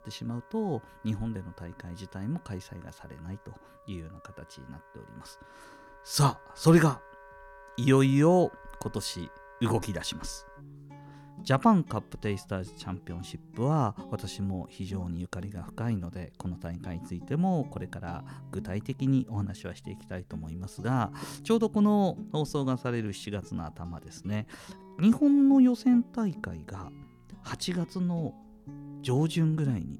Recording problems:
background music; faint; throughout; 20 dB below the speech

